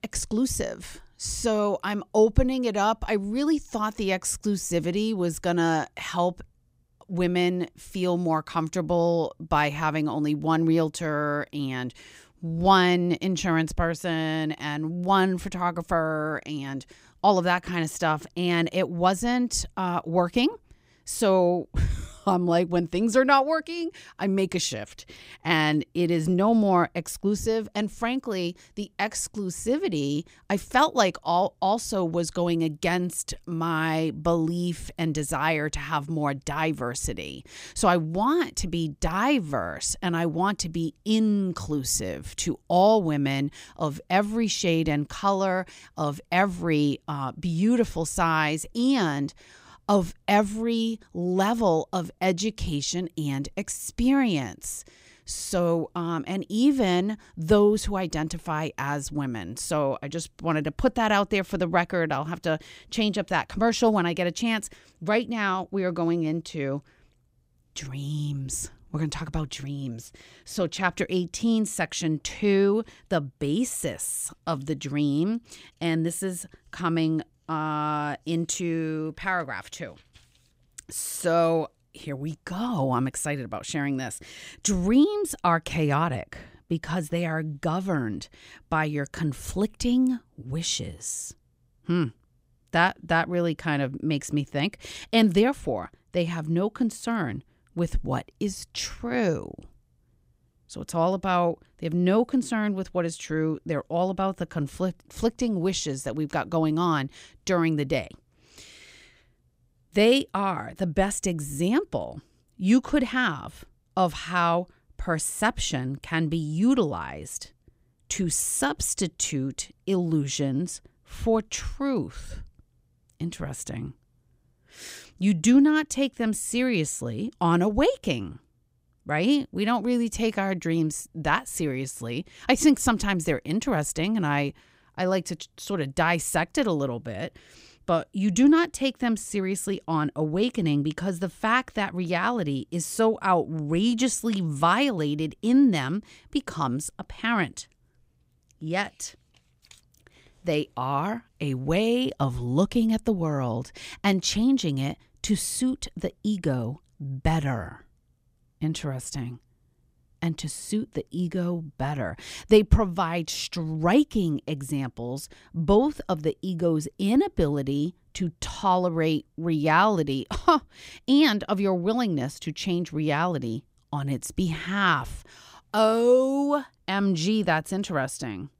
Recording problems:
none

